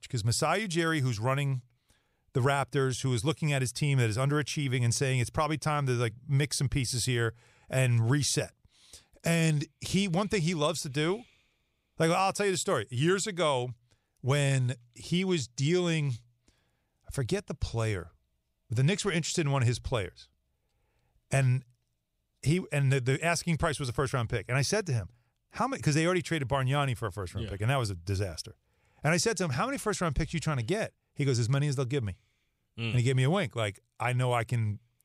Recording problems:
none

